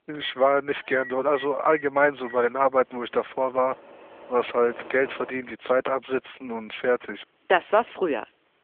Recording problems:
phone-call audio; nothing above 3.5 kHz
household noises; noticeable; throughout; 20 dB below the speech

